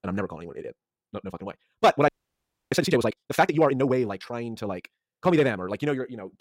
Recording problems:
wrong speed, natural pitch; too fast; 1.6 times normal speed
audio freezing; at 2 s for 0.5 s

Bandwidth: 16 kHz